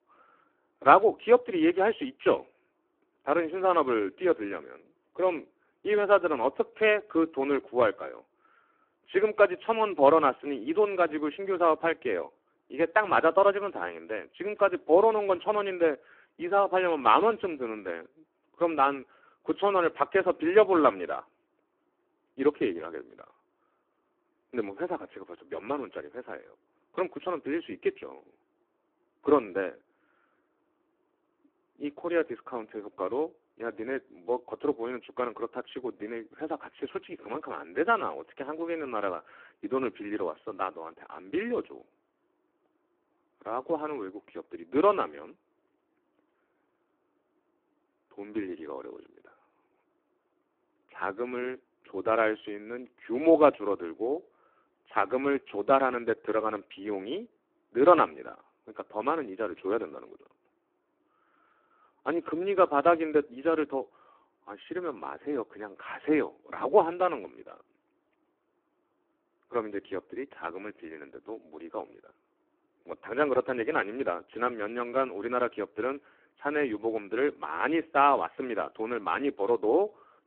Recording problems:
phone-call audio; poor line

